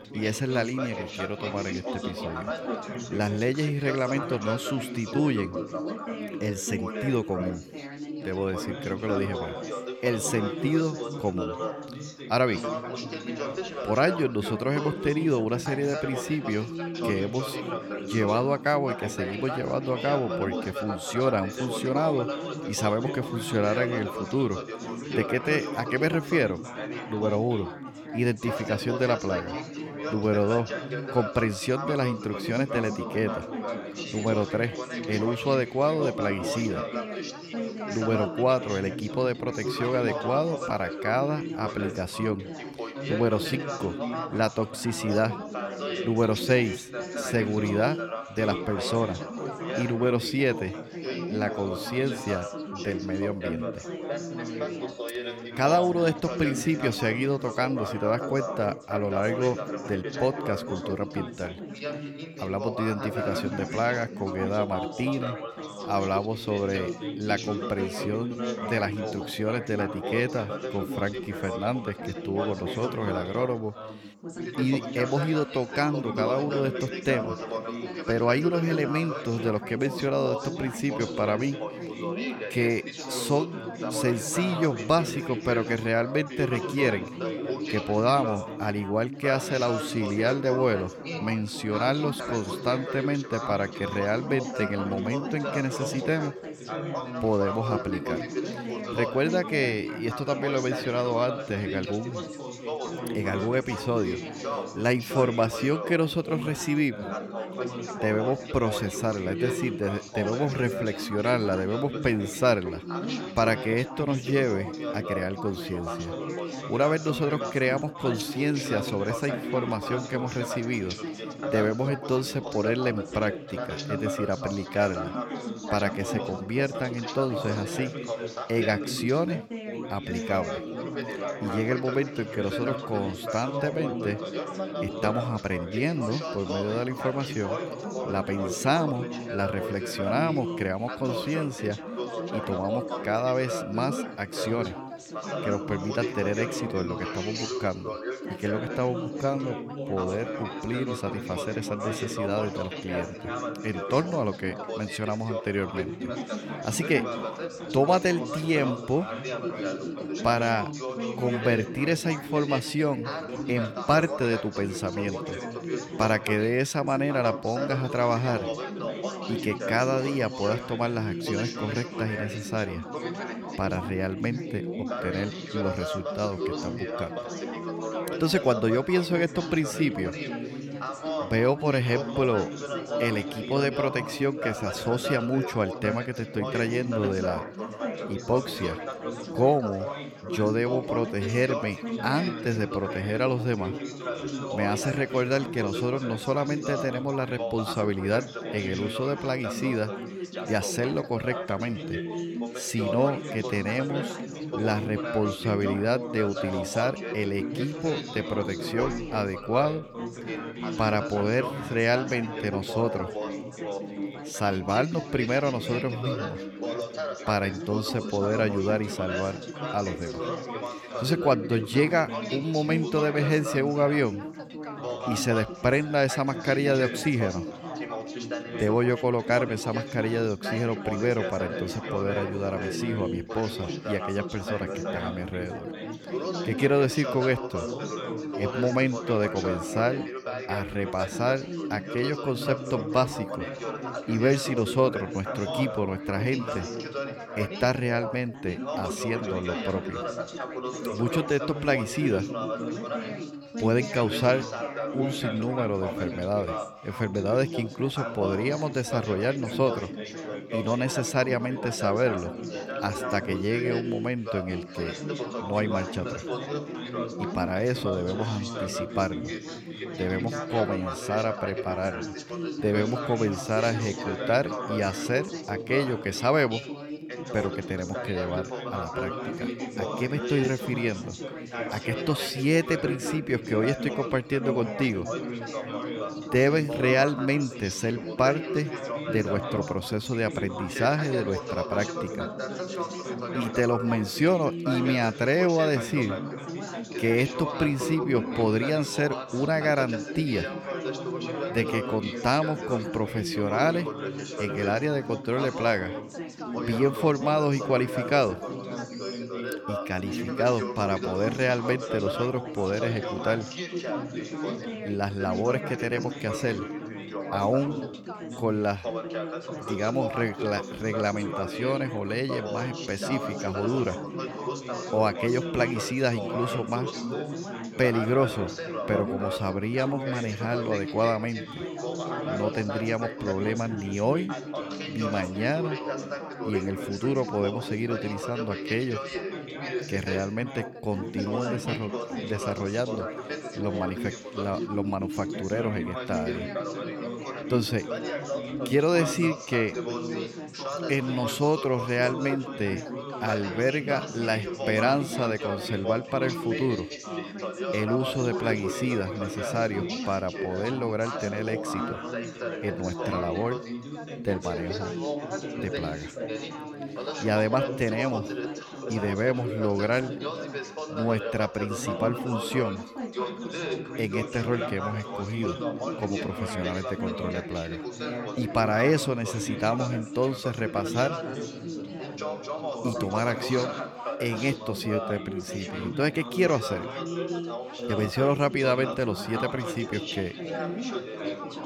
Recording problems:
background chatter; loud; throughout; 4 voices, 5 dB below the speech

